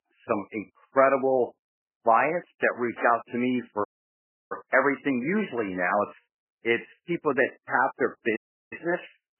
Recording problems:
garbled, watery; badly; nothing above 3 kHz
thin; somewhat; fading below 400 Hz
high-pitched whine; very faint; throughout; 2.5 kHz, 85 dB below the speech
audio cutting out; at 4 s for 0.5 s and at 8.5 s

